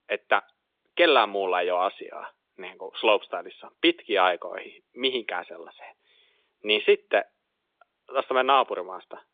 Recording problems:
phone-call audio; nothing above 3.5 kHz

